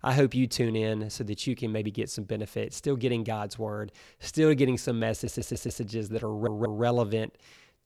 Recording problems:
audio stuttering; at 5 s and at 6.5 s

